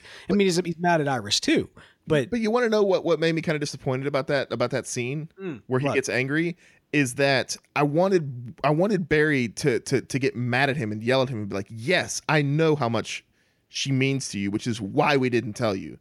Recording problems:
none

